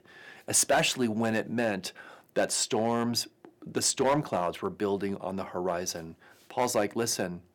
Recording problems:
distortion; slight; 2% of the sound clipped

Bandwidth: 18 kHz